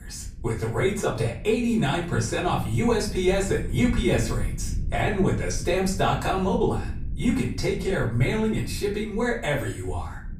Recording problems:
off-mic speech; far
room echo; slight; dies away in 0.4 s
low rumble; faint; throughout; 25 dB below the speech

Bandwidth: 15 kHz